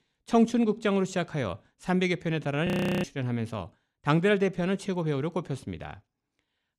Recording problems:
audio freezing; at 2.5 s

